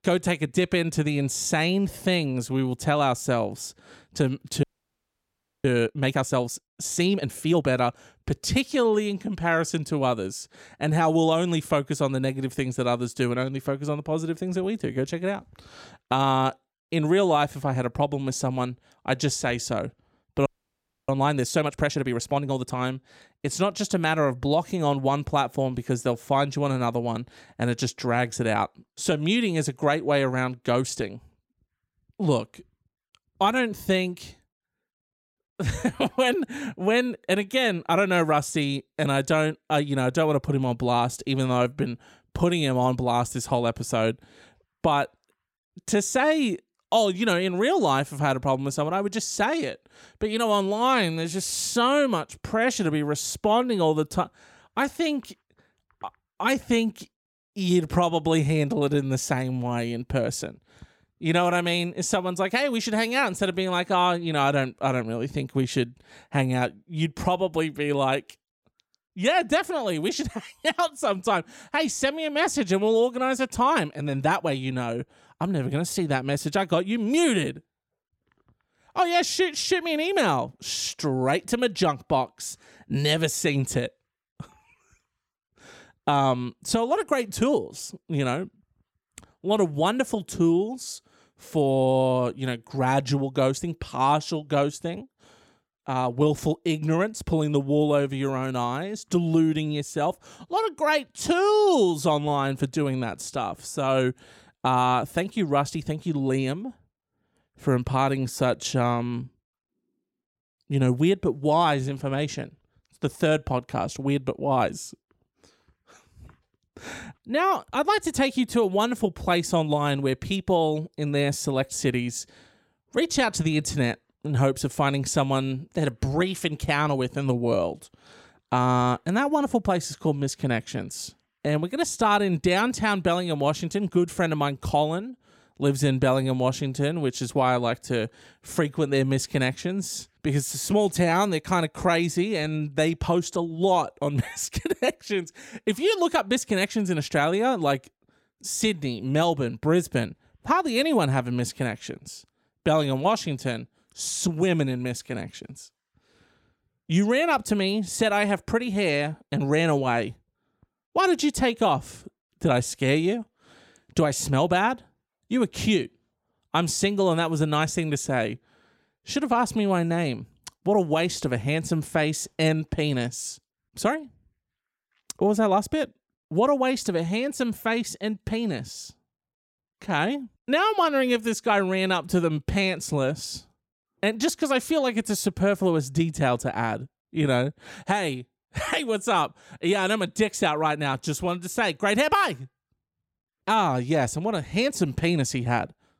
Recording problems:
audio freezing; at 4.5 s for 1 s and at 20 s for 0.5 s

